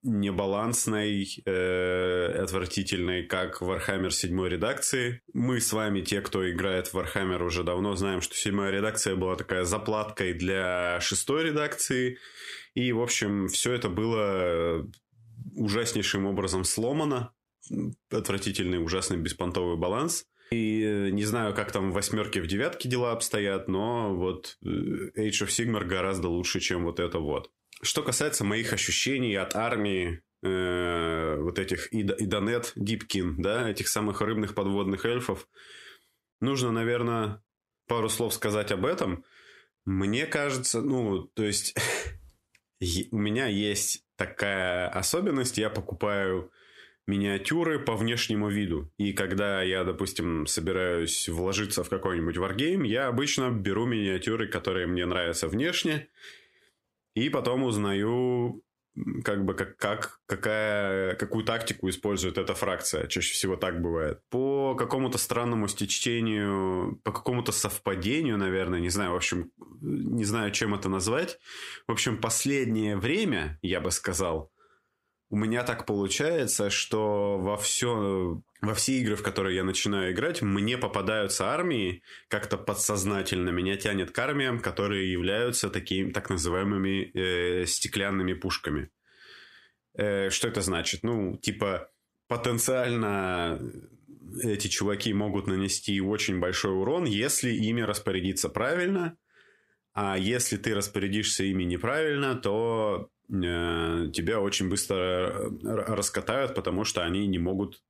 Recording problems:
squashed, flat; somewhat

